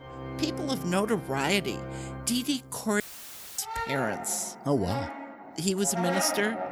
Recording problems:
background music; loud; throughout; 7 dB below the speech
audio cutting out; filled with static; at 3 s for 0.5 s

